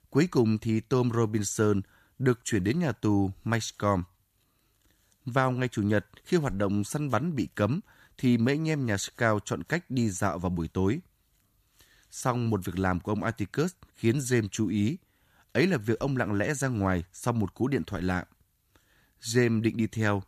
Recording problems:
none

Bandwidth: 14.5 kHz